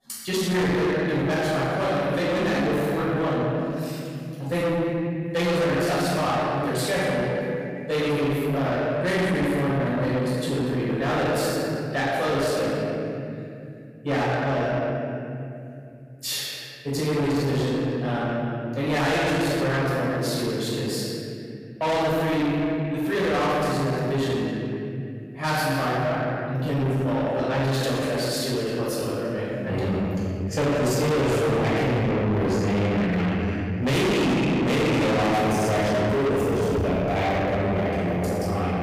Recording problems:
distortion; heavy; 6 dB below the speech
room echo; strong; dies away in 2.5 s
off-mic speech; far

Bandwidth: 15 kHz